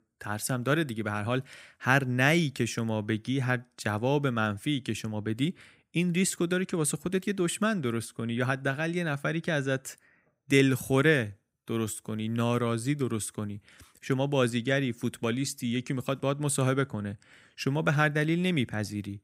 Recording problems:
none

